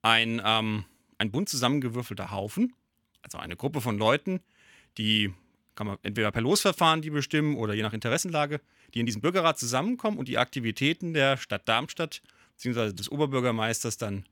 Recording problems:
uneven, jittery; strongly; from 1 to 13 s

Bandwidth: 18 kHz